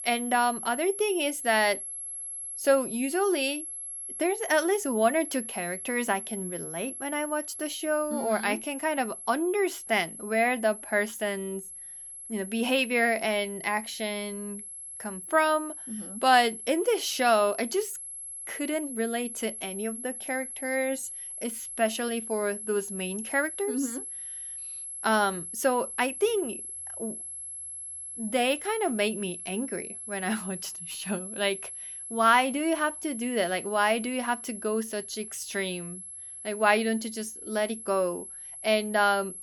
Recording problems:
high-pitched whine; loud; throughout; 11 kHz, 9 dB below the speech

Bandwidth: 18 kHz